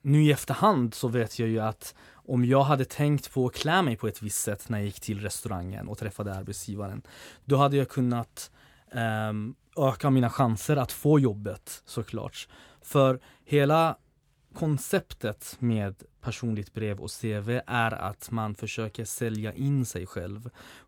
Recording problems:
none

